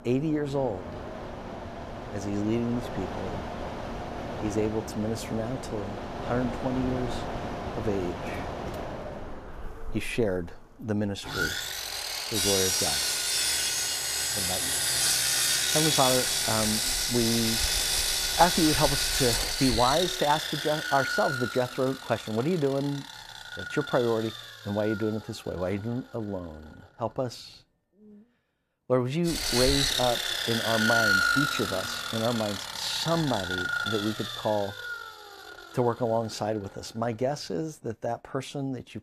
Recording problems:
machinery noise; very loud; throughout; 2 dB above the speech

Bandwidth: 14.5 kHz